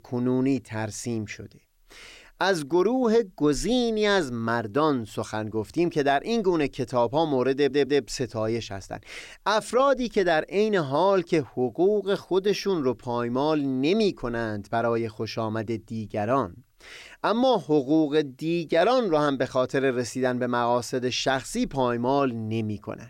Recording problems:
audio stuttering; at 7.5 s

